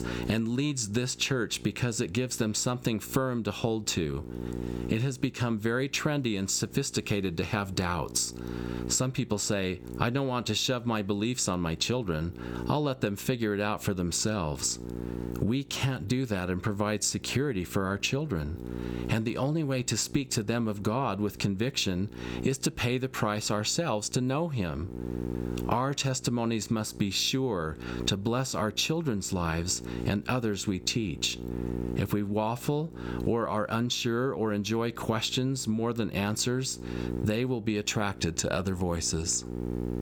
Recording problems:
squashed, flat; somewhat
electrical hum; noticeable; throughout; 60 Hz, 15 dB below the speech

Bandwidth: 18 kHz